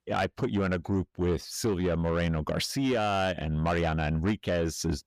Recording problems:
distortion; slight; 10 dB below the speech

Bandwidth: 15 kHz